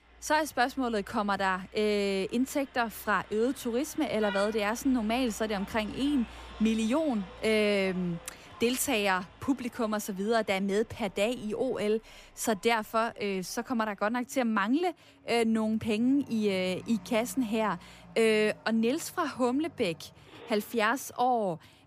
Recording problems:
traffic noise; faint; throughout; 20 dB below the speech

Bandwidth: 15 kHz